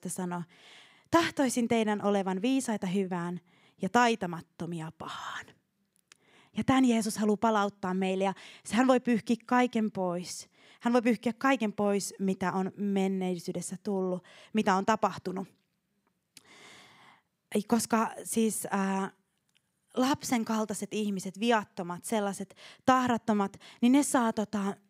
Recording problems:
none

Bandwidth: 15.5 kHz